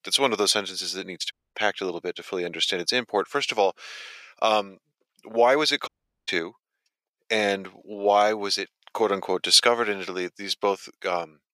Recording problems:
thin; very; fading below 500 Hz
audio cutting out; at 1.5 s and at 6 s

